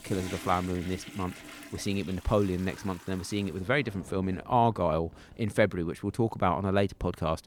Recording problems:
household noises; noticeable; throughout; 15 dB below the speech

